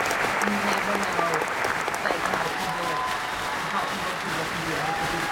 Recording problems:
off-mic speech; far
room echo; very slight; dies away in 0.2 s
crowd noise; very loud; throughout; 7 dB above the speech

